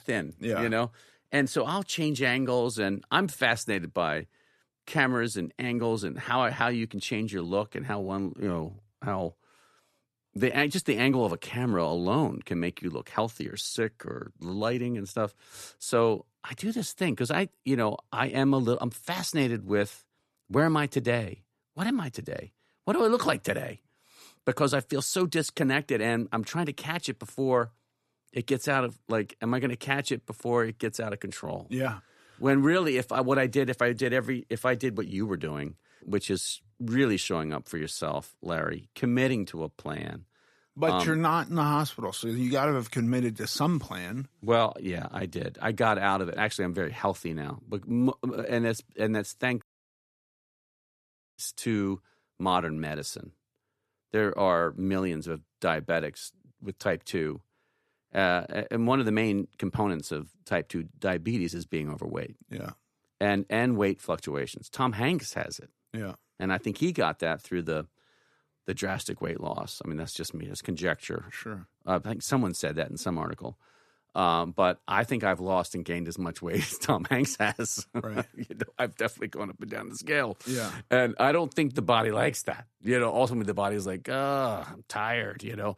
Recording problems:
audio cutting out; at 50 s for 2 s

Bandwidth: 13.5 kHz